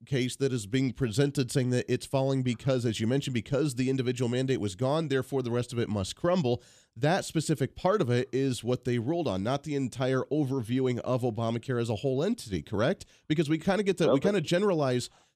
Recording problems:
none

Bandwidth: 14.5 kHz